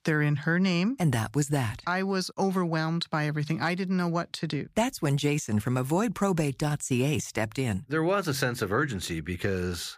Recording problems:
none

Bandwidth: 15 kHz